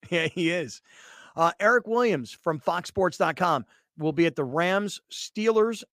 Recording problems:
none

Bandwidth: 15 kHz